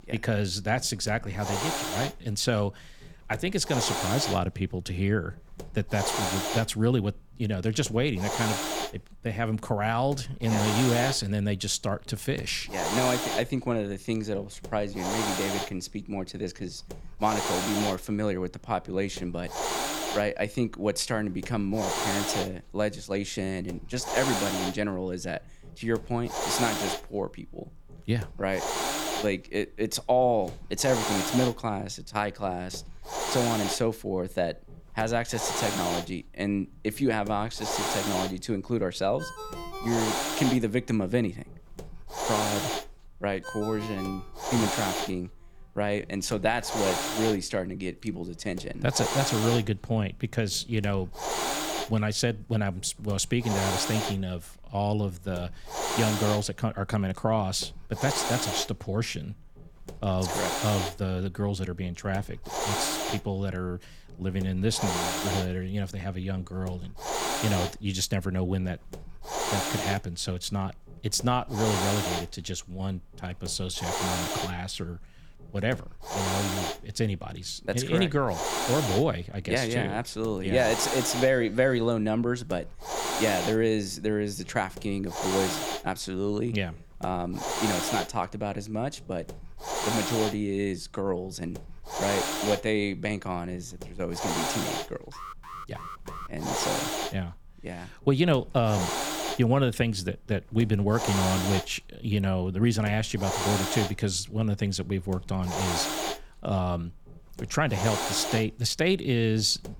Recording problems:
hiss; loud; throughout; 2 dB below the speech
phone ringing; noticeable; from 39 to 45 s; peak 10 dB below the speech
alarm; faint; from 1:35 to 1:36; peak 10 dB below the speech

